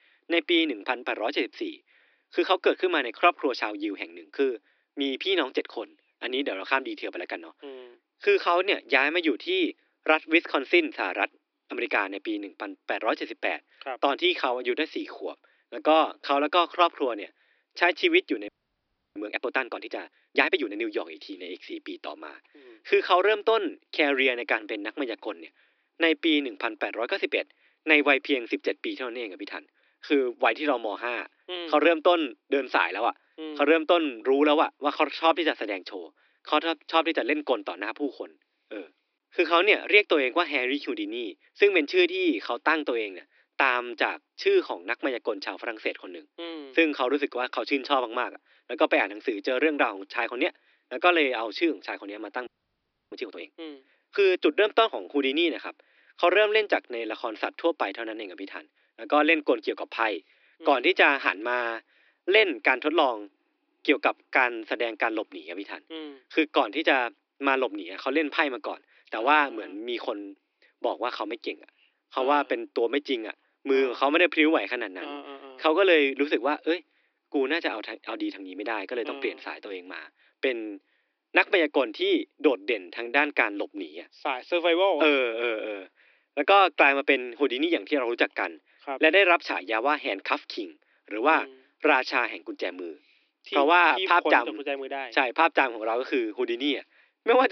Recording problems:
thin; somewhat; fading below 300 Hz
high frequencies cut off; noticeable; nothing above 5.5 kHz
audio freezing; at 18 s for 0.5 s and at 52 s for 0.5 s
abrupt cut into speech; at the end

